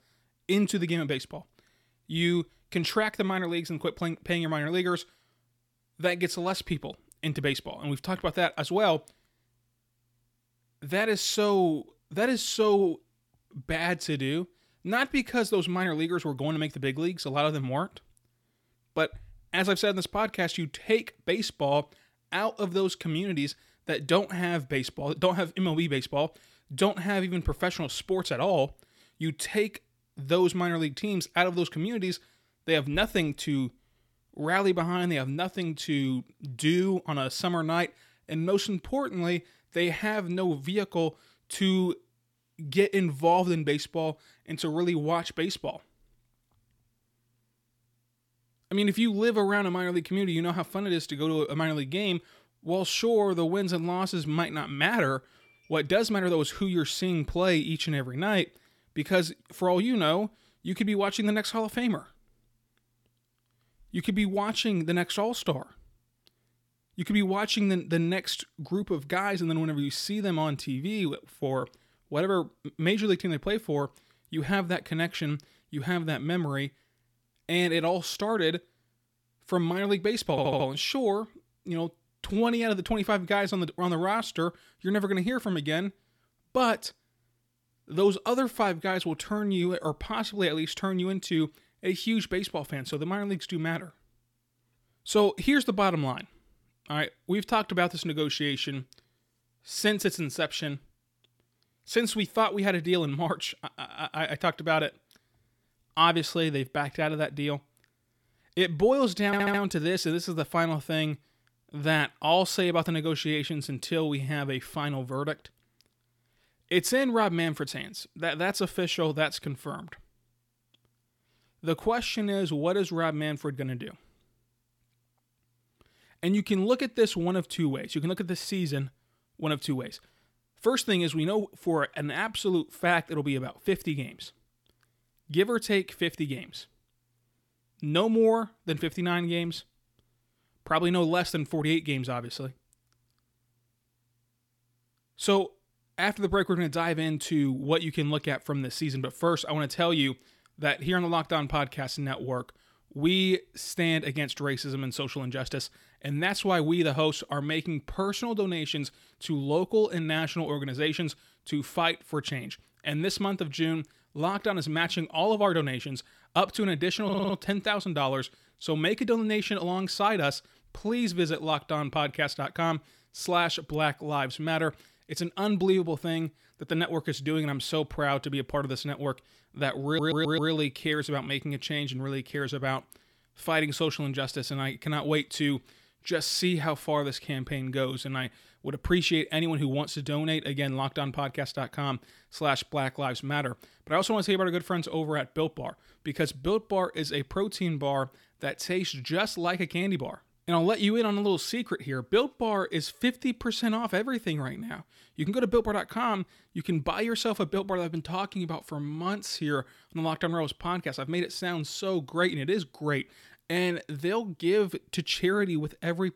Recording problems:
audio stuttering; 4 times, first at 1:20

